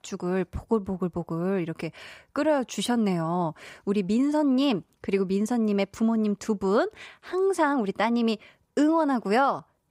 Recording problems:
none

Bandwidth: 15.5 kHz